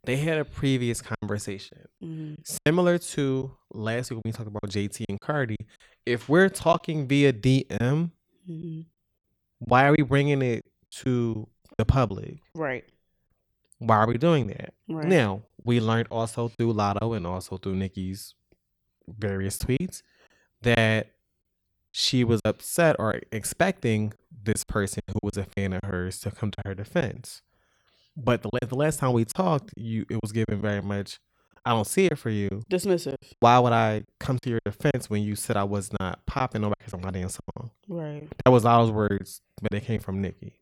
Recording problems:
choppy; very; 7% of the speech affected

